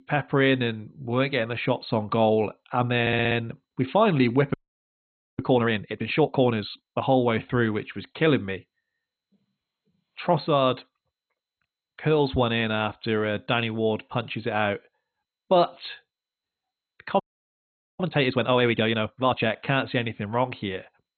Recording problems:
garbled, watery; badly; nothing above 4 kHz
audio stuttering; at 3 s
audio freezing; at 4.5 s for 1 s and at 17 s for 1 s

